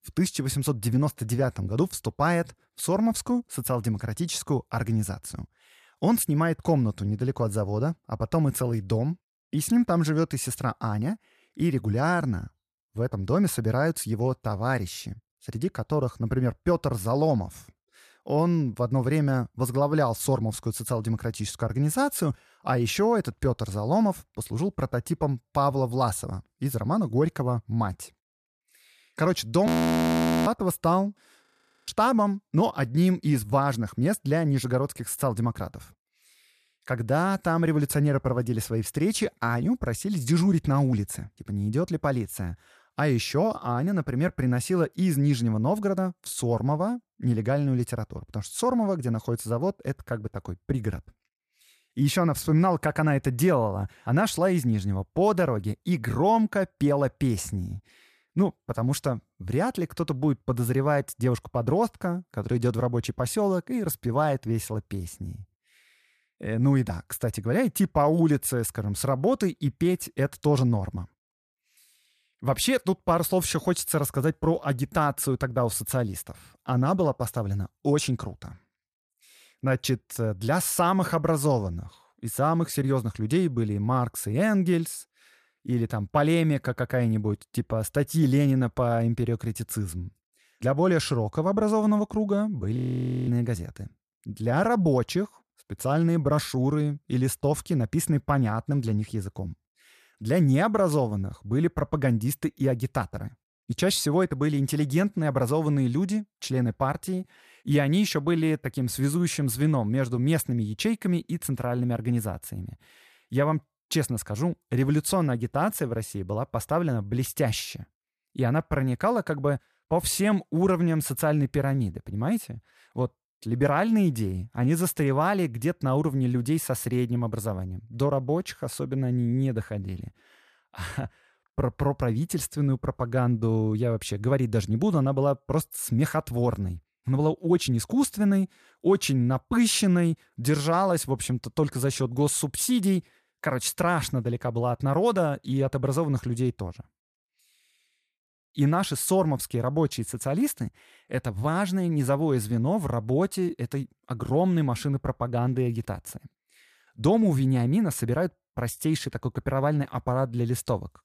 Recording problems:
audio freezing; at 30 s for 1 s, at 31 s and at 1:33 for 0.5 s

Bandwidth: 14.5 kHz